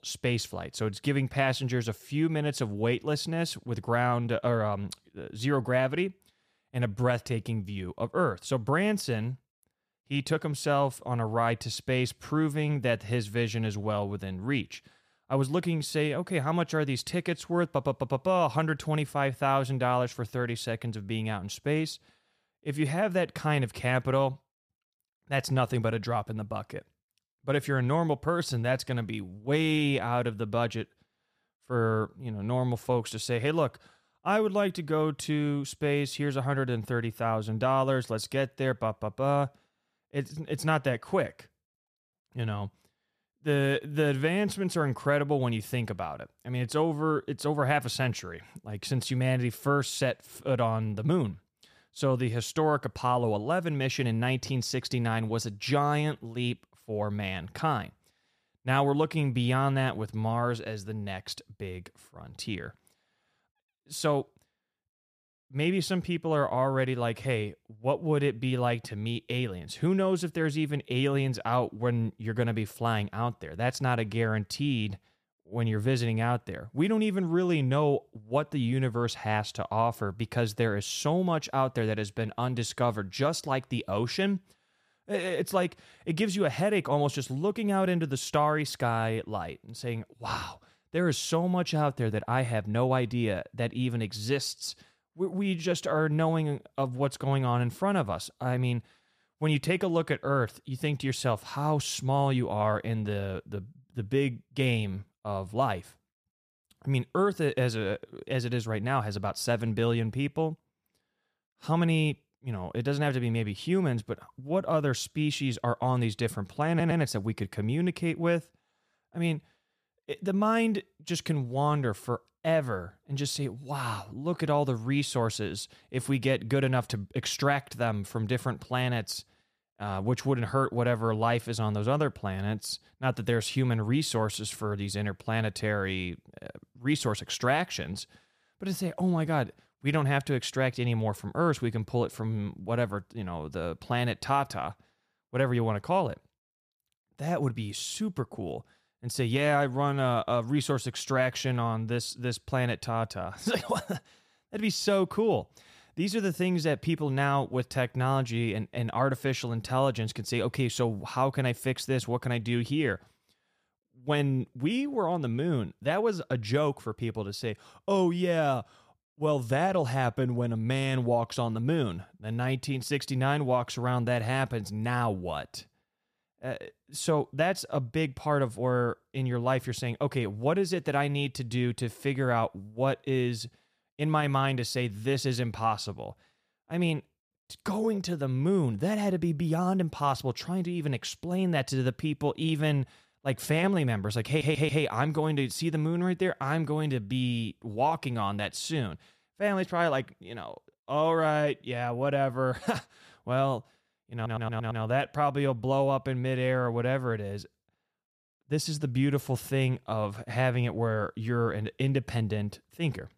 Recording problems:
audio stuttering; at 1:57, at 3:14 and at 3:24

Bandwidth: 14.5 kHz